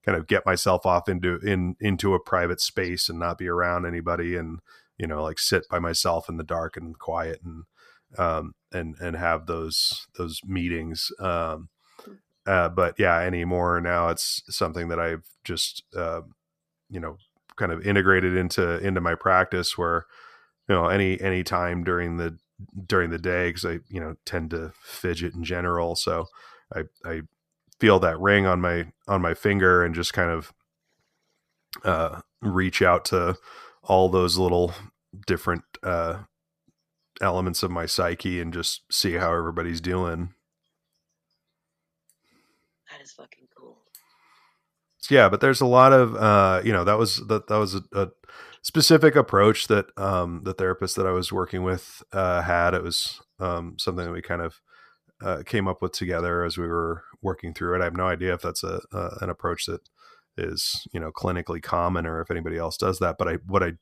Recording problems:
none

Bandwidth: 14.5 kHz